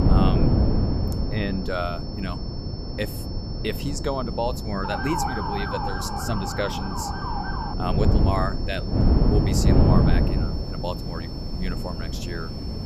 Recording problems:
wind noise on the microphone; heavy; 2 dB below the speech
high-pitched whine; noticeable; throughout; 5.5 kHz, 10 dB below the speech
wind in the background; faint; throughout; 20 dB below the speech
siren; loud; from 5 to 7.5 s; peak 3 dB above the speech

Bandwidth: 14.5 kHz